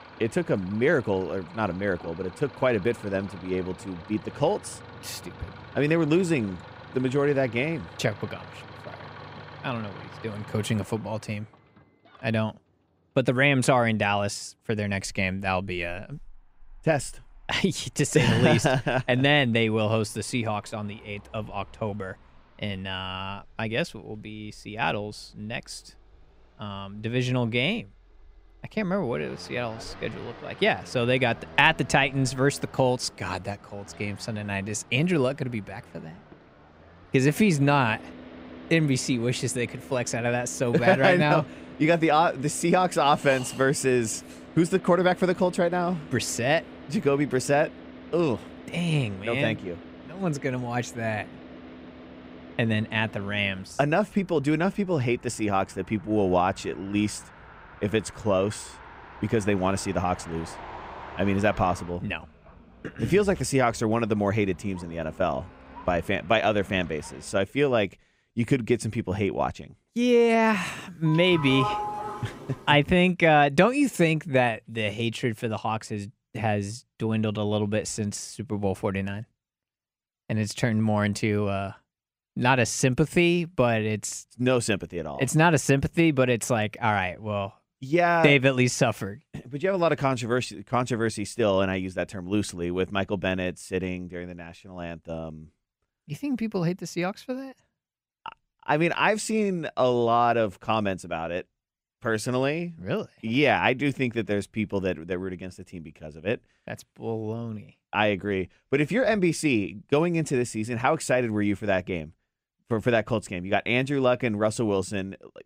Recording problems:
traffic noise; noticeable; until 1:07; 20 dB below the speech
doorbell; noticeable; from 1:11 to 1:13; peak 3 dB below the speech

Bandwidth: 15.5 kHz